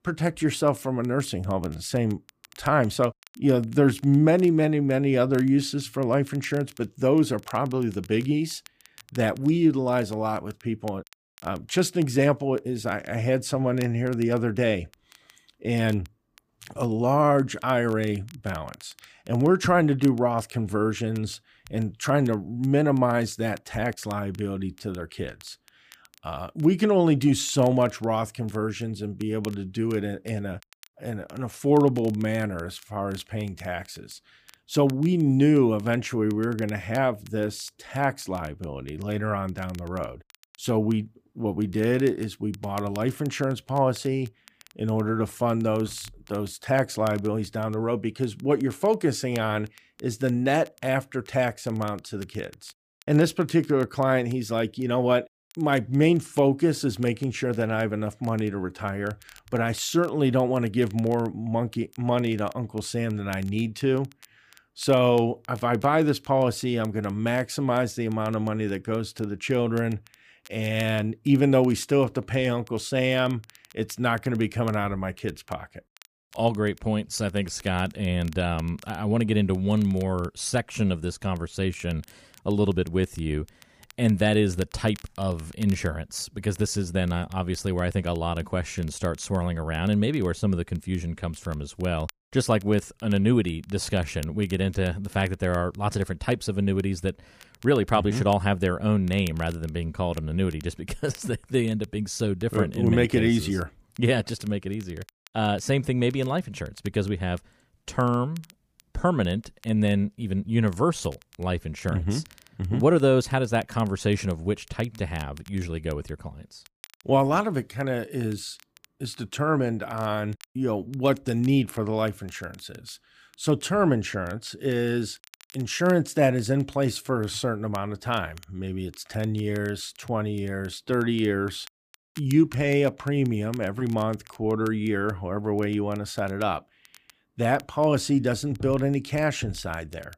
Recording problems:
crackle, like an old record; faint; 25 dB below the speech

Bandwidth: 15 kHz